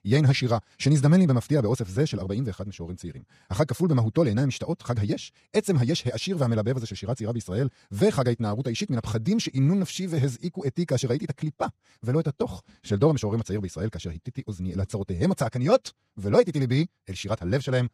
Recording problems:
wrong speed, natural pitch; too fast; 1.7 times normal speed

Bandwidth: 14.5 kHz